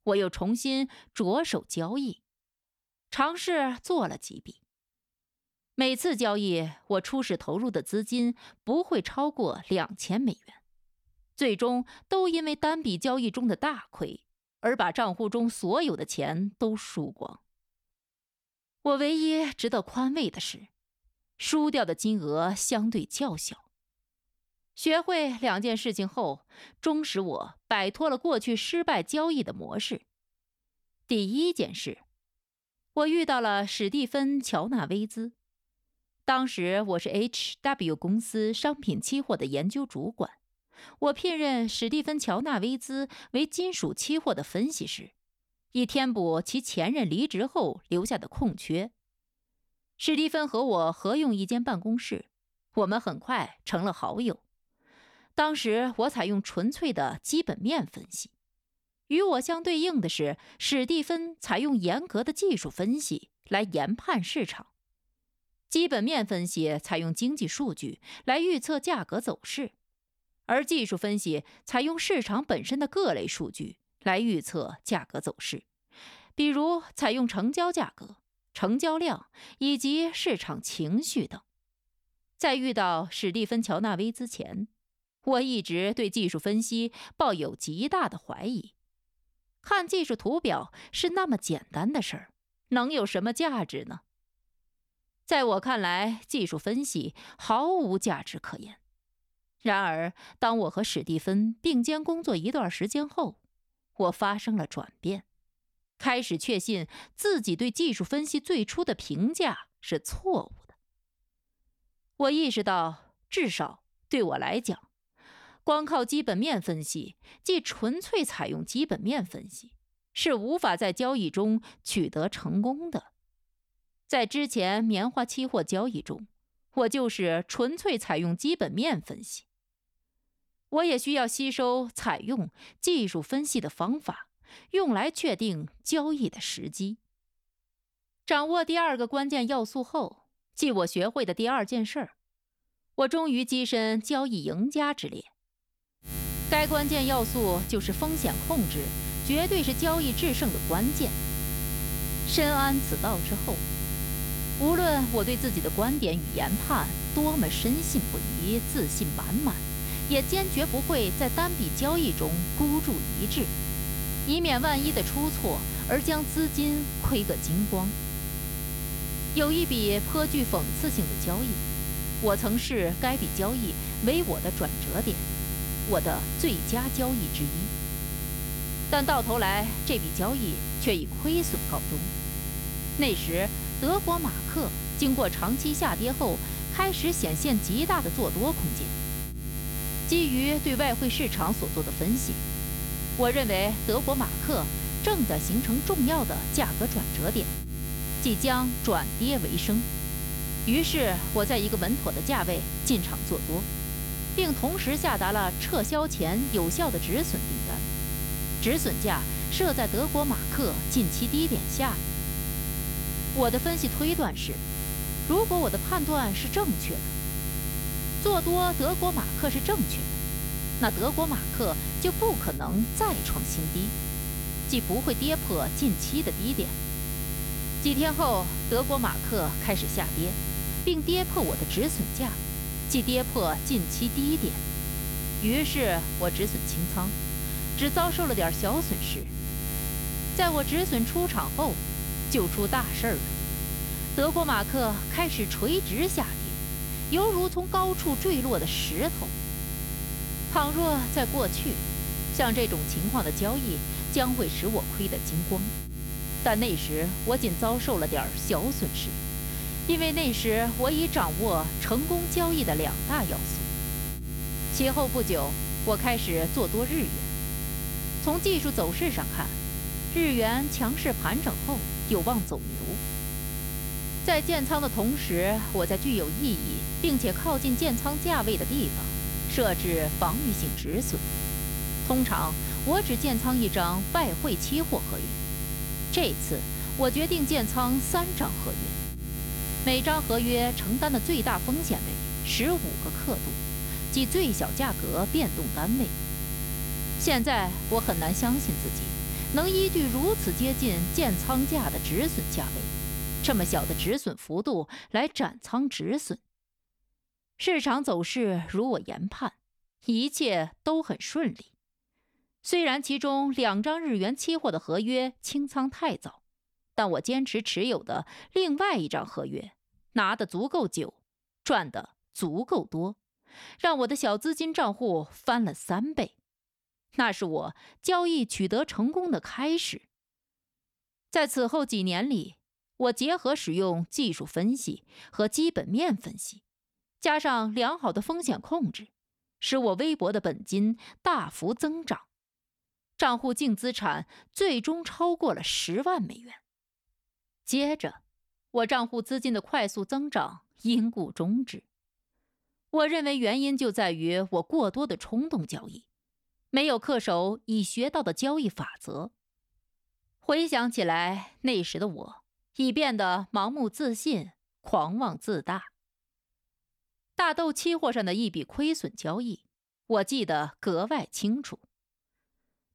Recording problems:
electrical hum; loud; from 2:26 to 5:04; 60 Hz, 7 dB below the speech

